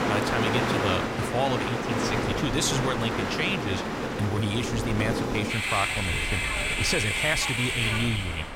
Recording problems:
train or aircraft noise; very loud; throughout; 1 dB above the speech
wind noise on the microphone; occasional gusts; 20 dB below the speech

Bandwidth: 16.5 kHz